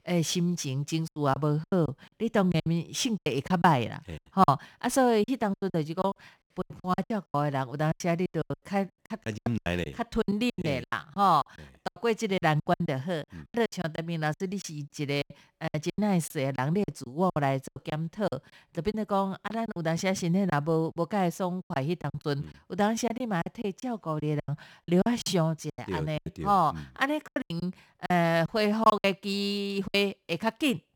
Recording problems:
choppy; very; 15% of the speech affected

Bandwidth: 18.5 kHz